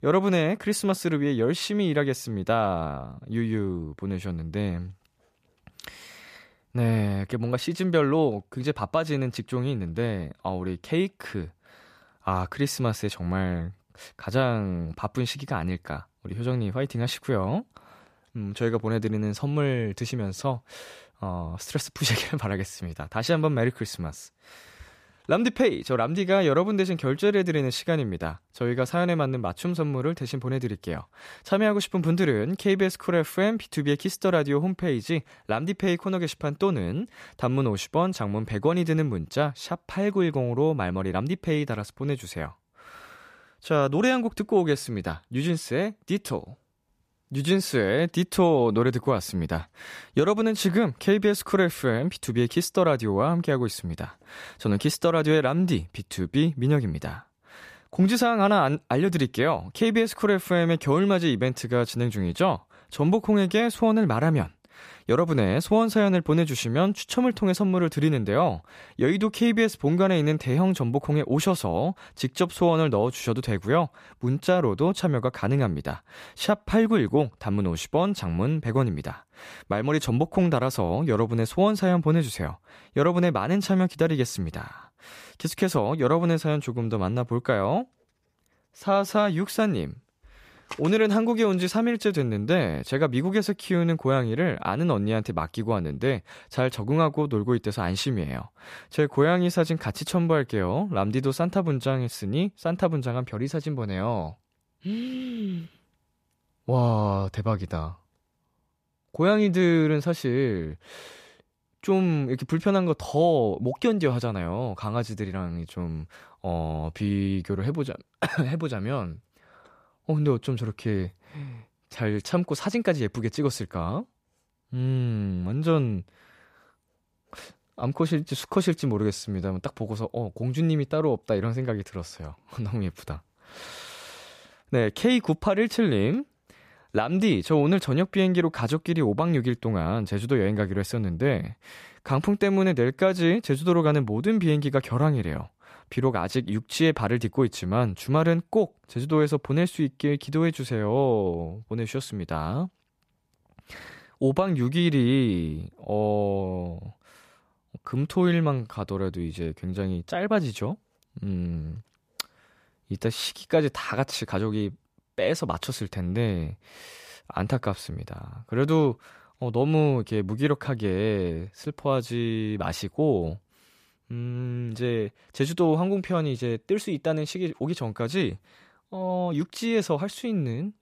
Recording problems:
none

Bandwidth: 14.5 kHz